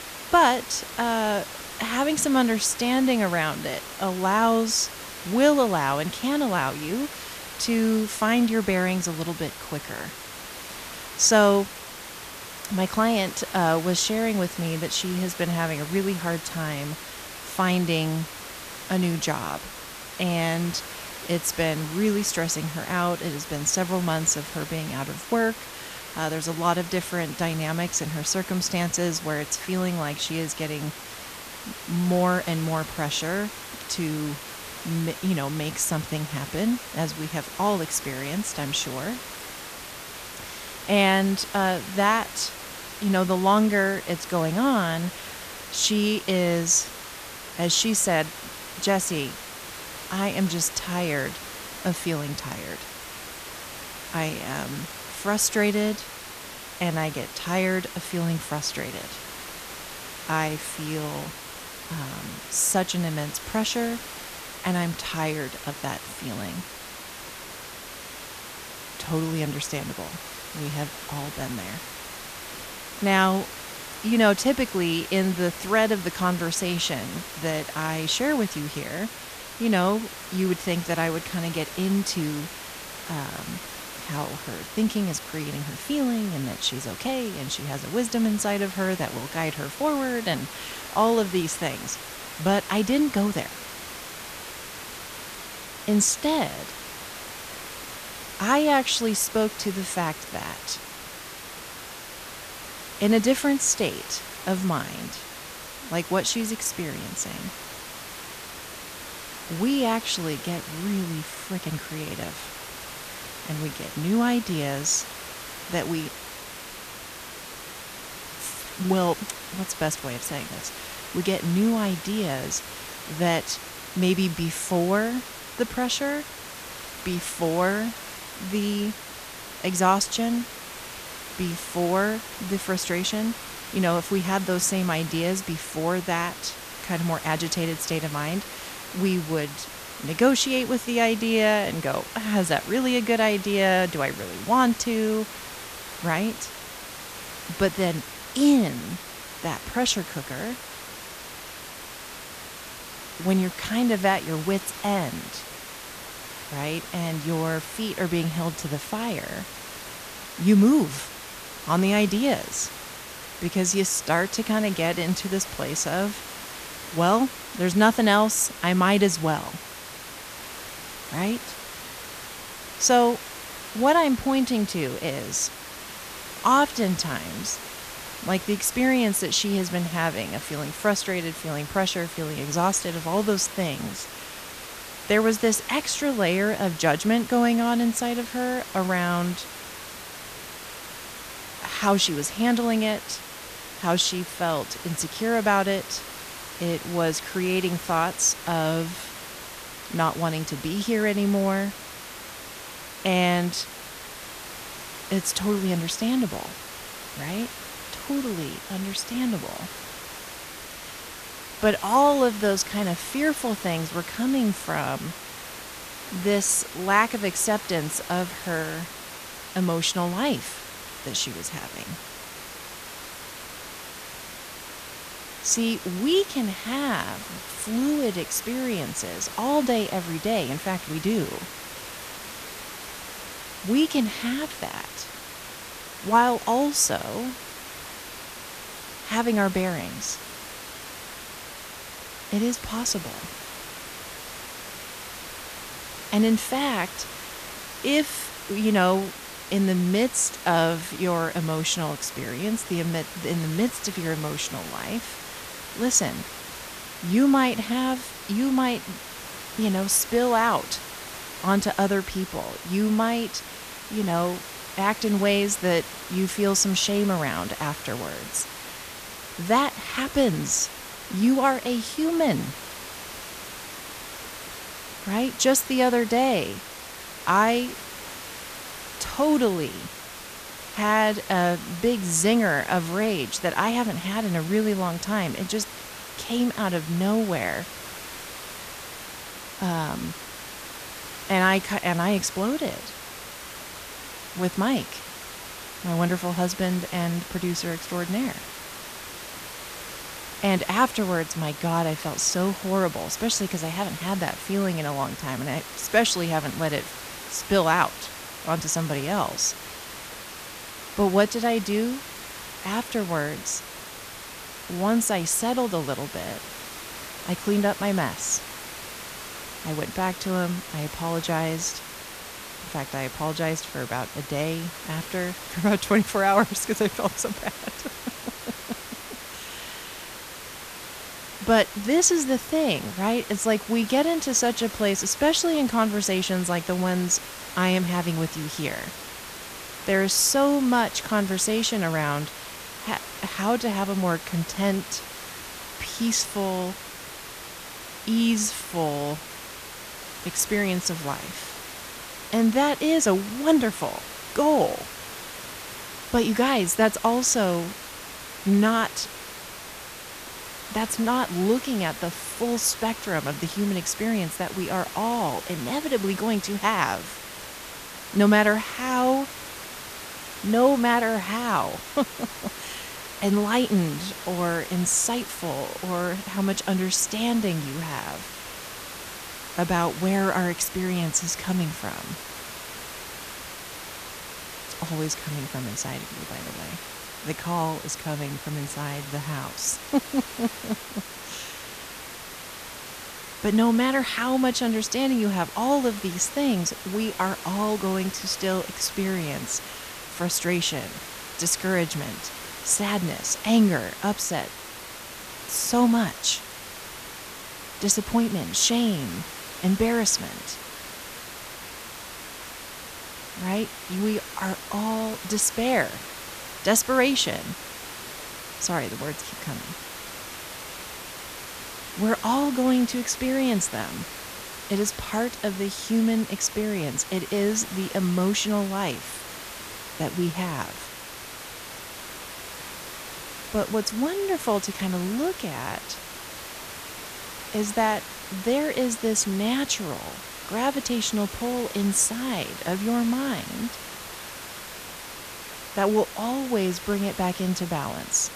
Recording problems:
hiss; noticeable; throughout; 10 dB below the speech

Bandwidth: 14.5 kHz